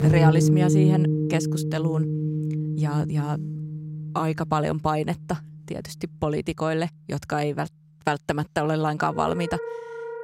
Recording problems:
background music; very loud; throughout; 2 dB above the speech

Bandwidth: 16 kHz